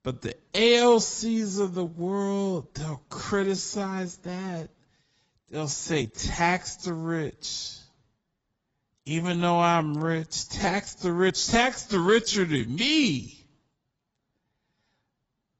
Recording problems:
garbled, watery; badly; nothing above 7.5 kHz
wrong speed, natural pitch; too slow; 0.6 times normal speed

